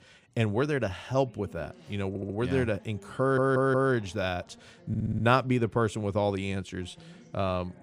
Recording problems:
voice in the background; faint; throughout; 25 dB below the speech
audio stuttering; at 2 s, at 3 s and at 5 s

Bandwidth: 15 kHz